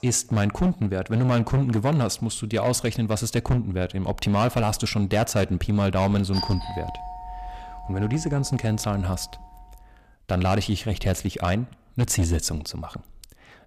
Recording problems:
distortion; slight; 7% of the sound clipped
doorbell; noticeable; from 6.5 to 10 s; peak 6 dB below the speech

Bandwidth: 14.5 kHz